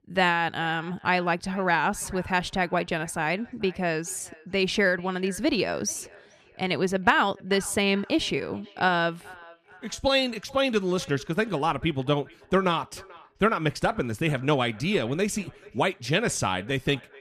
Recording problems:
echo of what is said; faint; throughout; 440 ms later, 25 dB below the speech

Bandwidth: 14.5 kHz